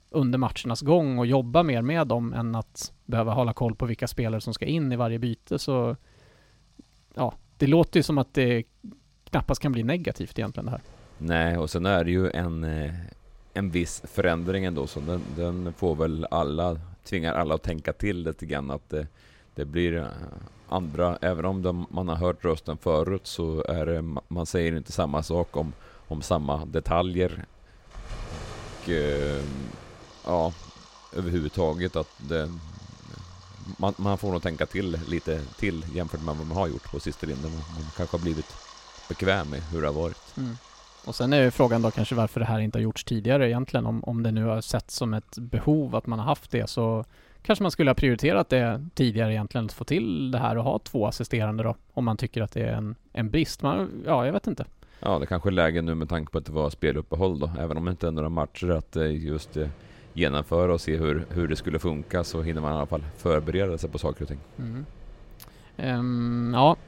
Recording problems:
rain or running water; faint; throughout; 20 dB below the speech

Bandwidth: 16 kHz